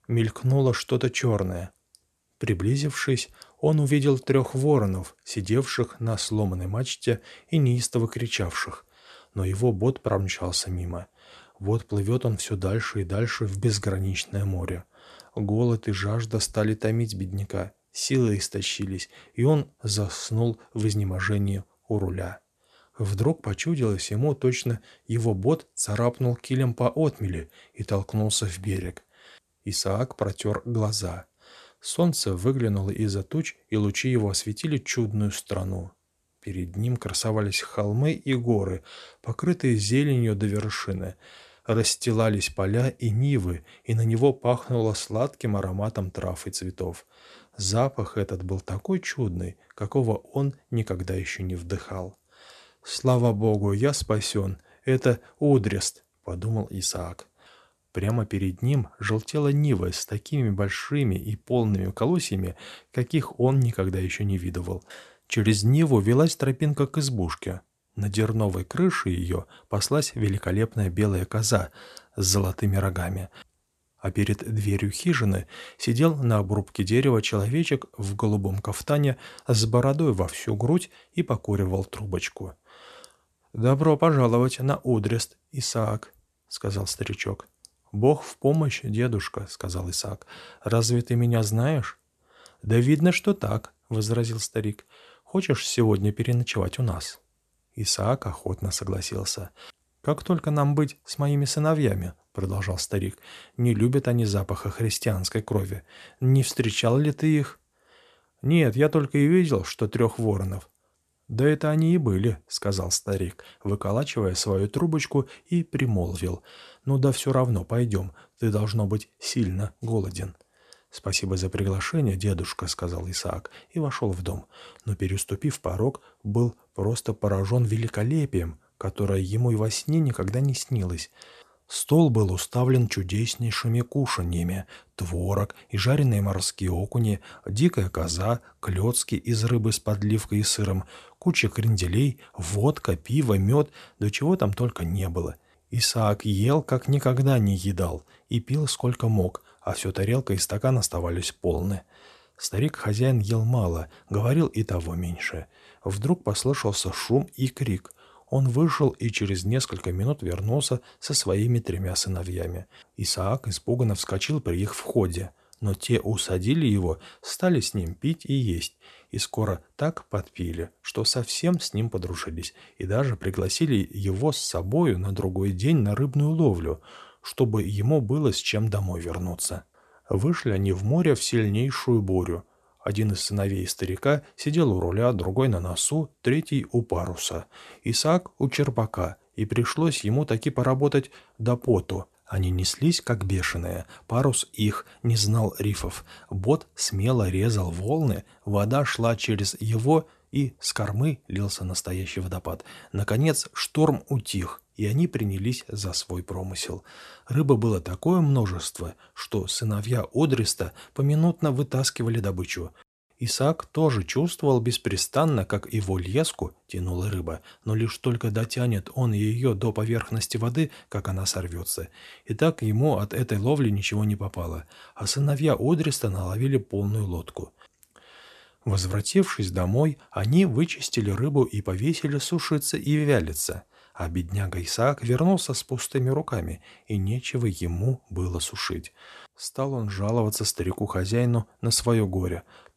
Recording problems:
none

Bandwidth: 13.5 kHz